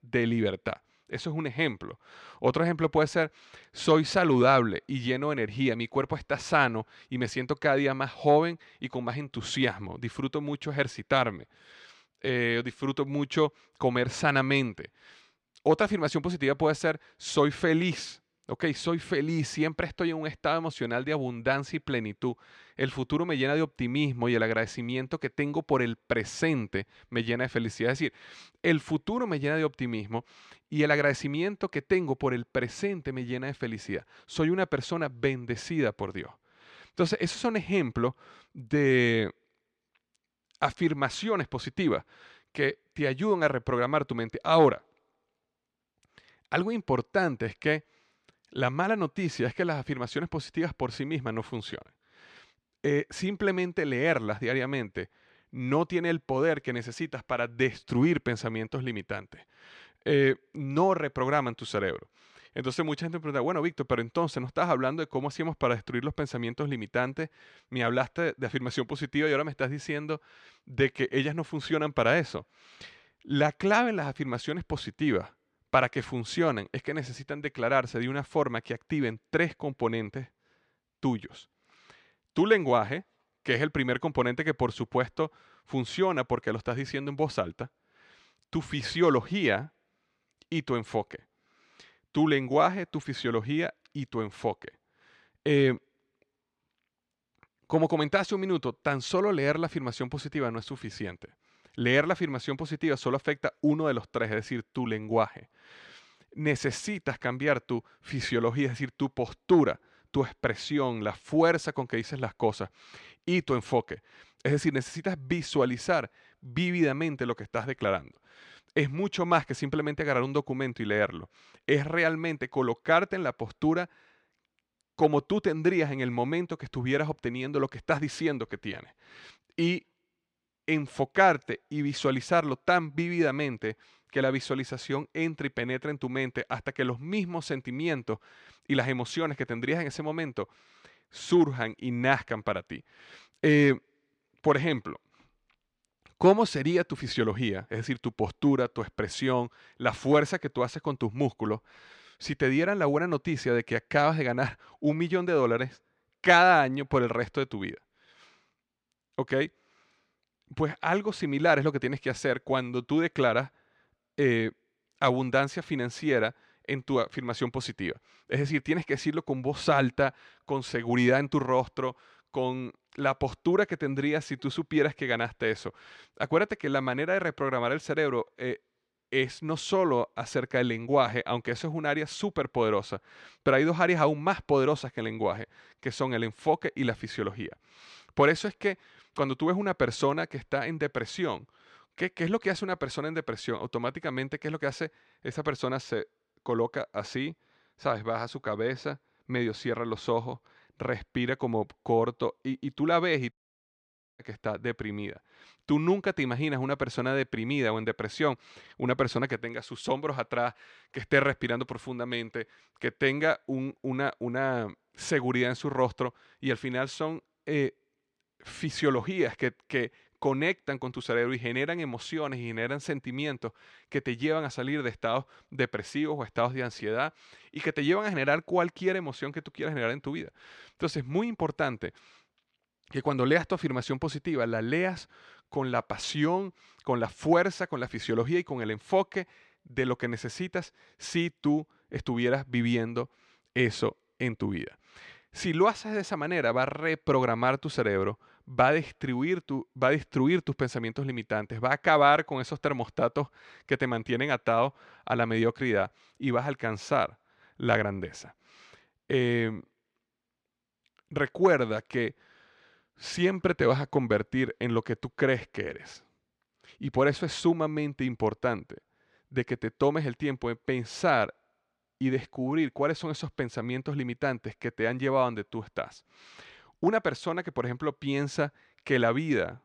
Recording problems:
audio cutting out; at 3:23 for 1 s

